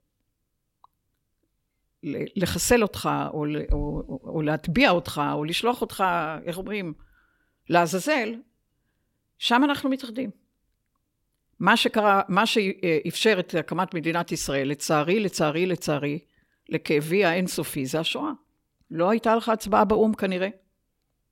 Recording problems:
none

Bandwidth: 16.5 kHz